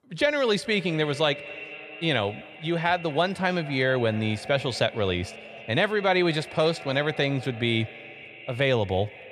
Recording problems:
echo of what is said; noticeable; throughout; 230 ms later, 15 dB below the speech

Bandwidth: 14 kHz